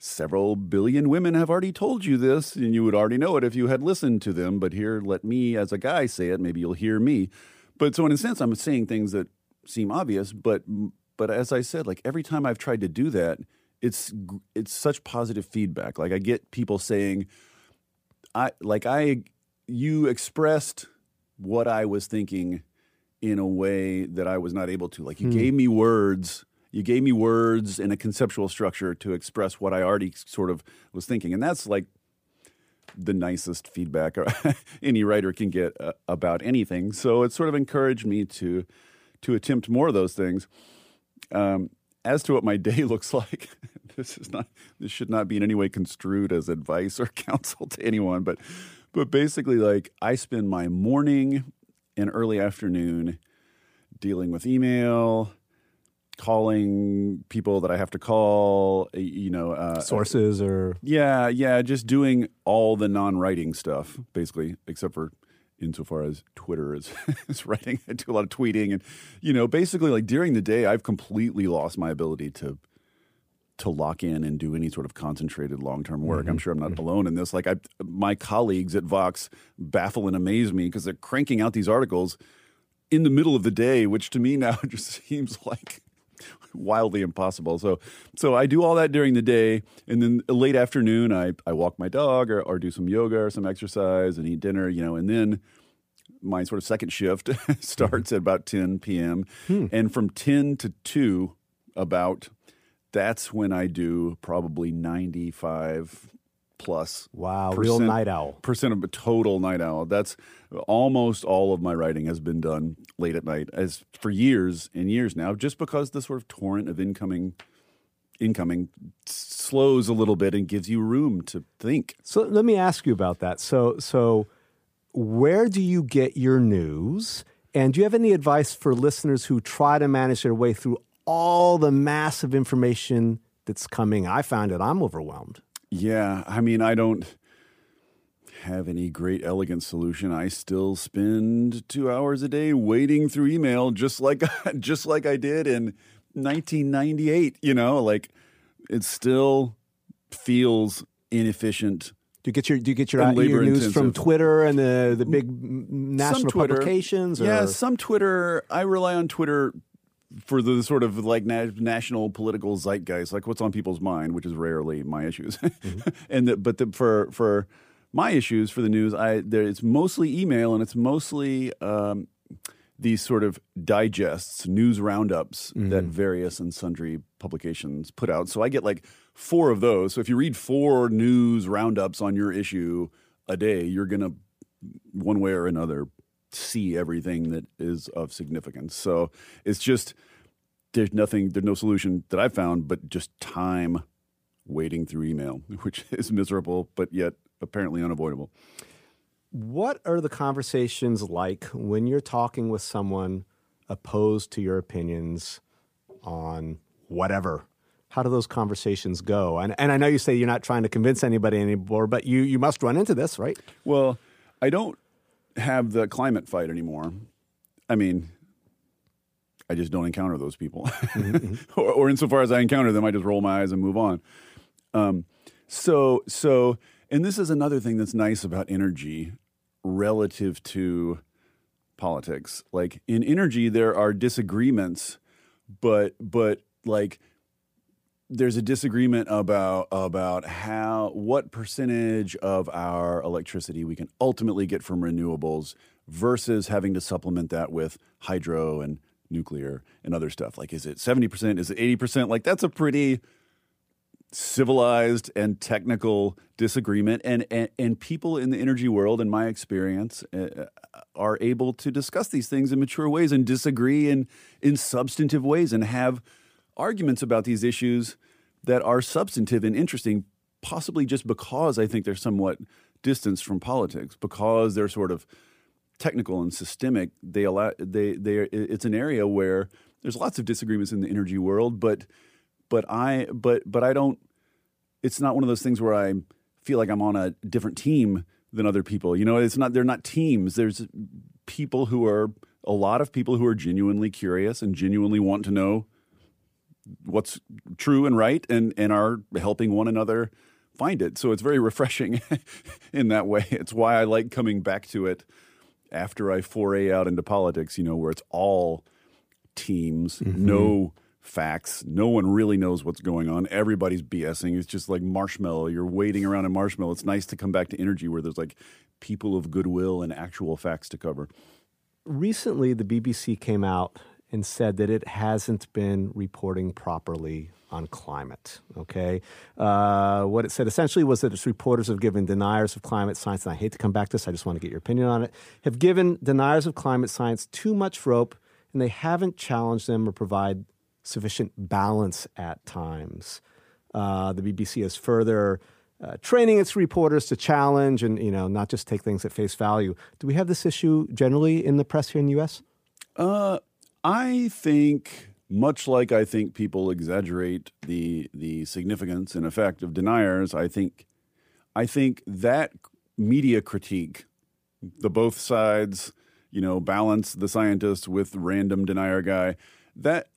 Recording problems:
none

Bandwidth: 15 kHz